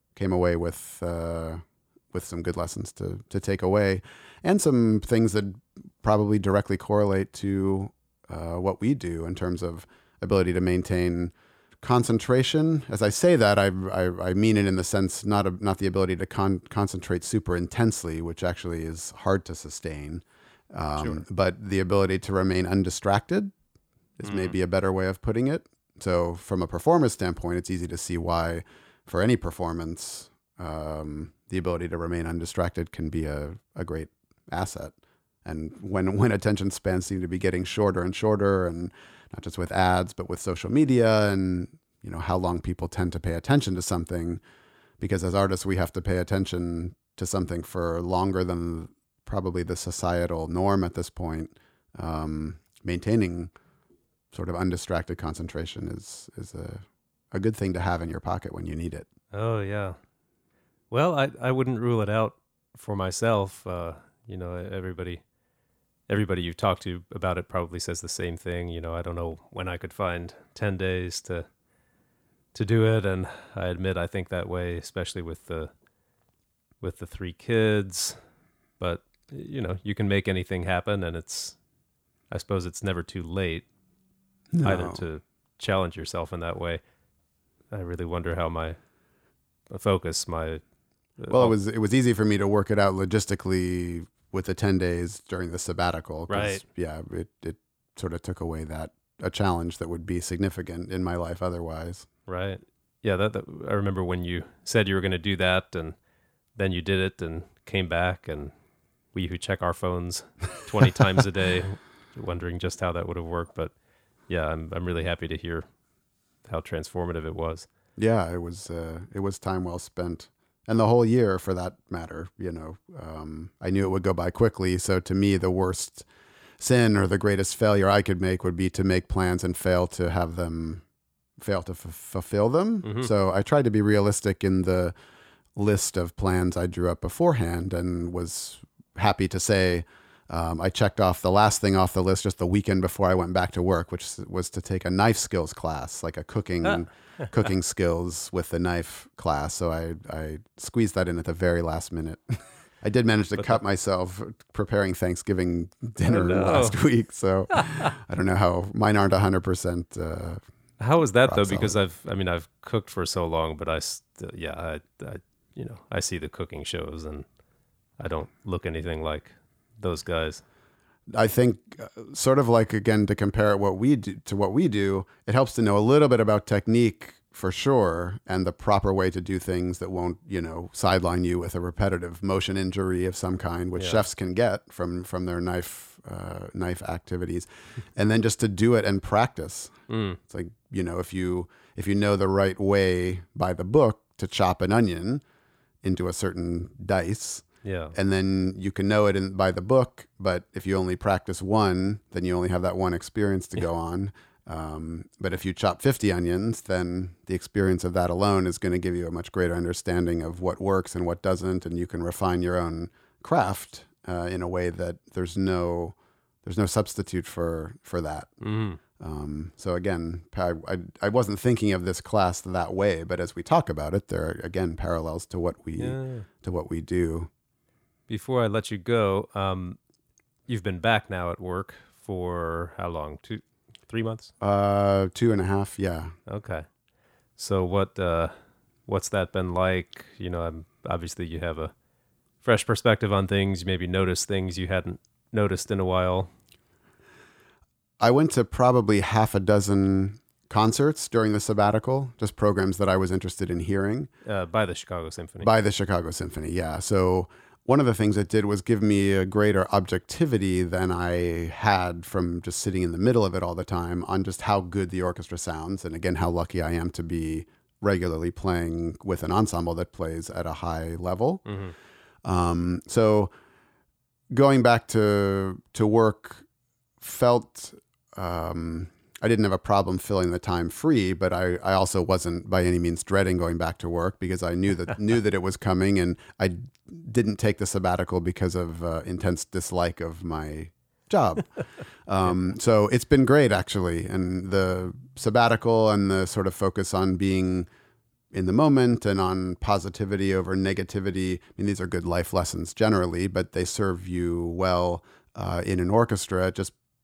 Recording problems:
none

